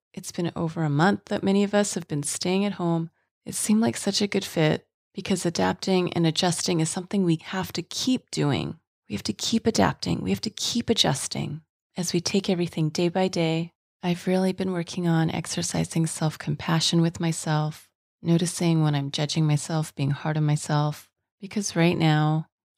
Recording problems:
none

